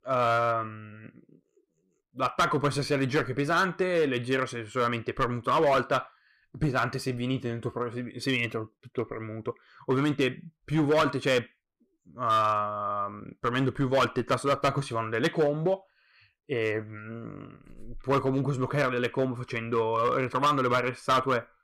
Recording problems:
distortion; slight; 5% of the sound clipped

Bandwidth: 15.5 kHz